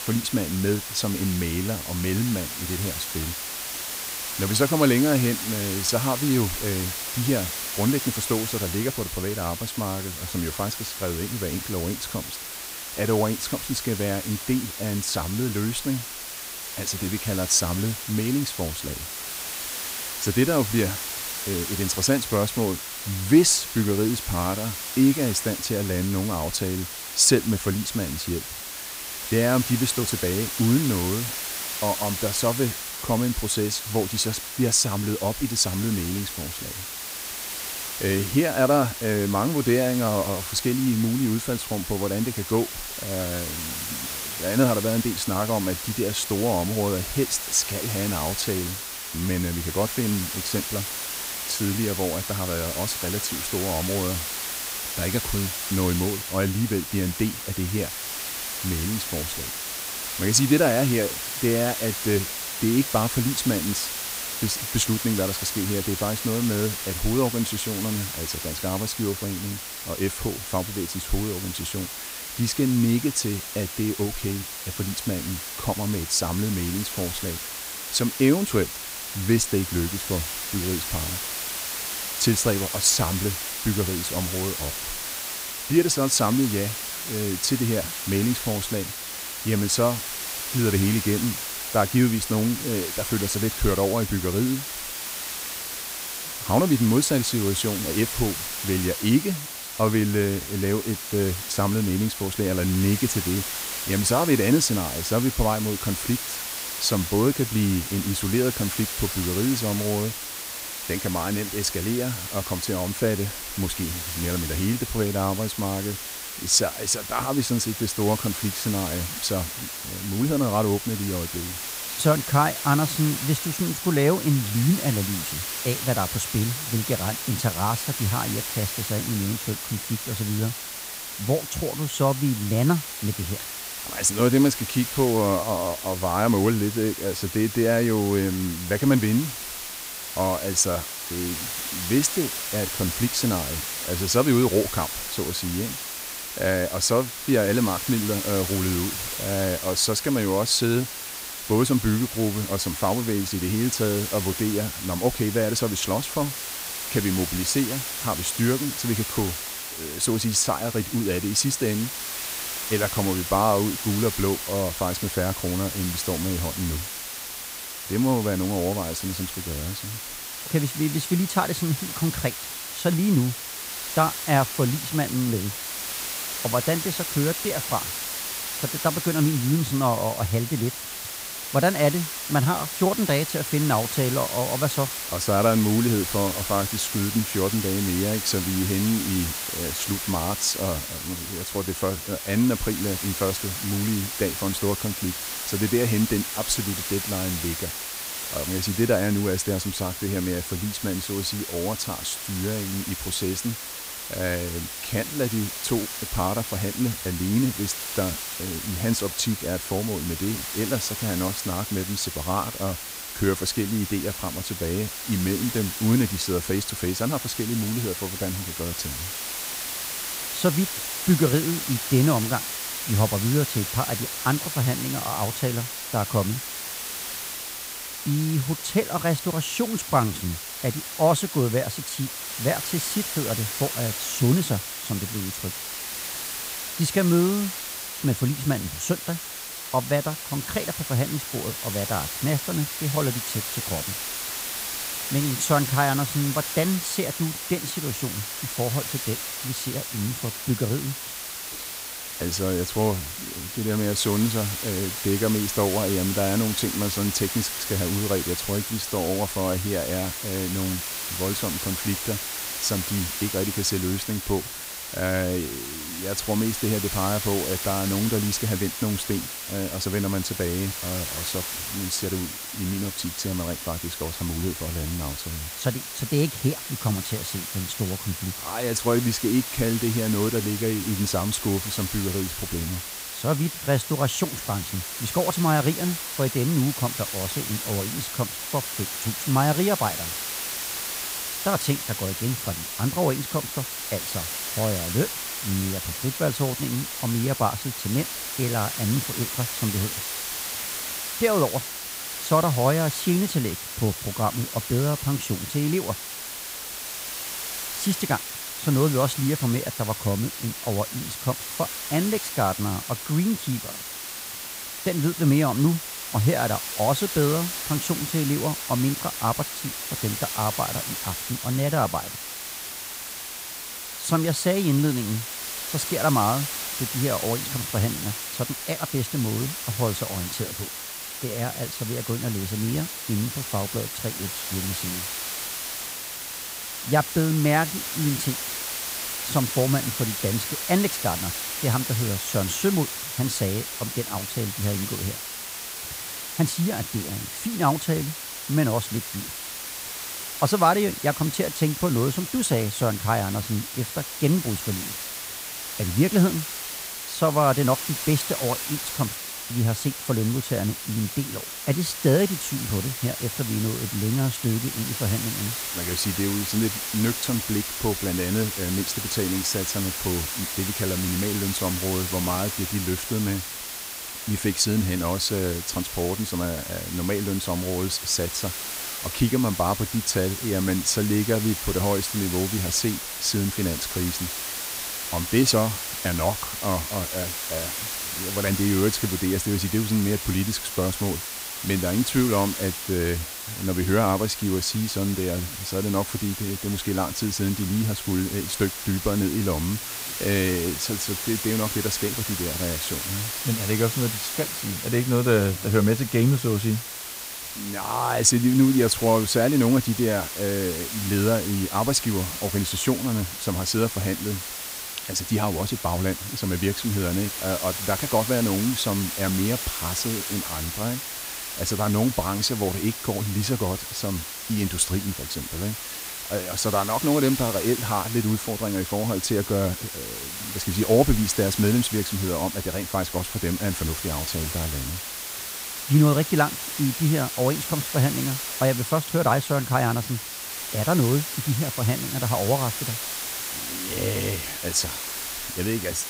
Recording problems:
hiss; loud; throughout; 4 dB below the speech

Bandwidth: 15.5 kHz